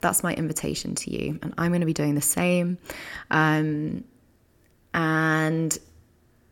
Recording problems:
none

